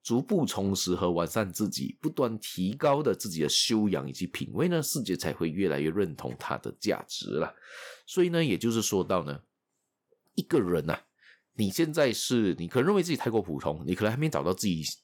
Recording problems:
none

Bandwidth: 18.5 kHz